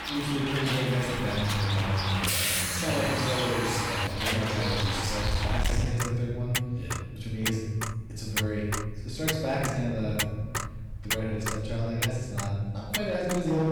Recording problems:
distortion; heavy; 8% of the sound clipped
room echo; strong; dies away in 1.7 s
off-mic speech; far
traffic noise; loud; throughout; 1 dB below the speech
abrupt cut into speech; at the end

